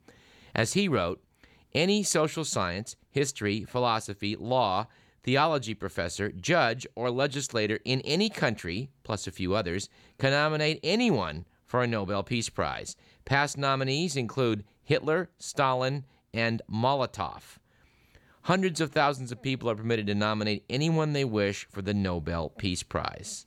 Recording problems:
none

